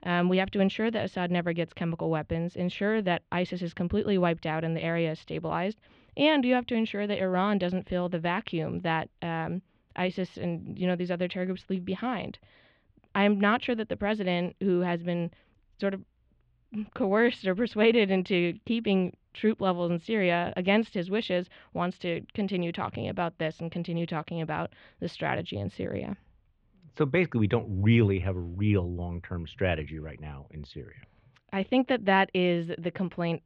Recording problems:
muffled; slightly; fading above 3 kHz

